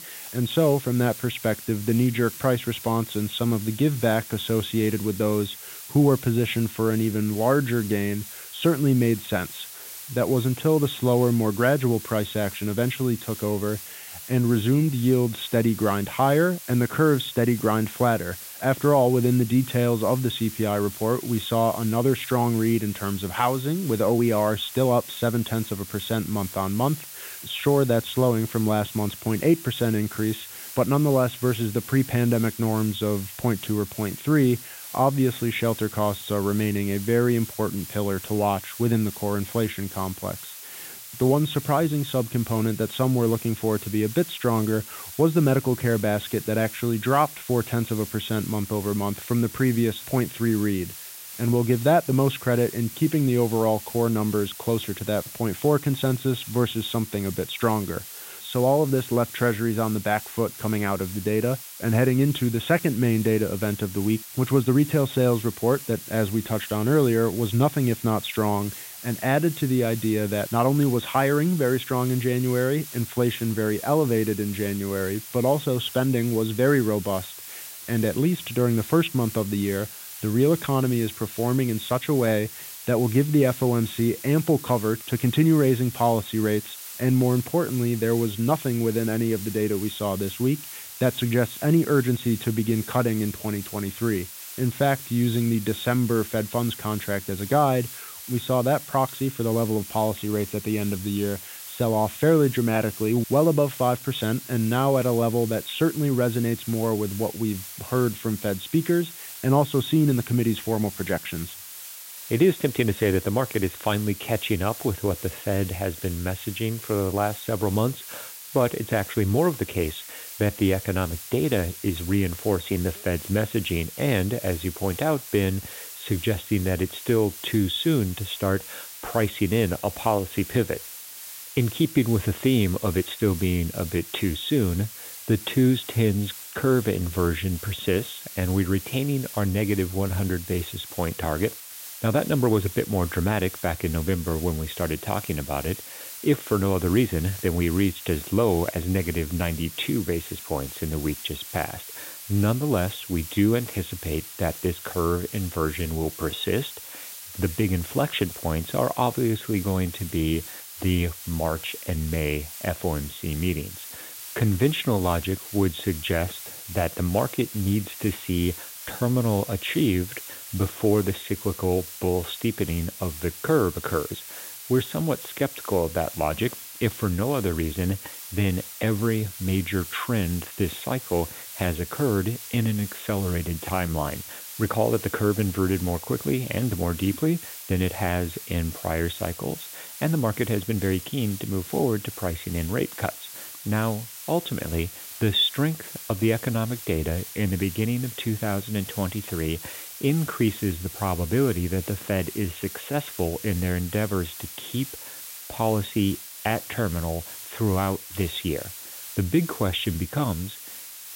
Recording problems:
high frequencies cut off; severe; nothing above 4 kHz
hiss; noticeable; throughout; 10 dB below the speech

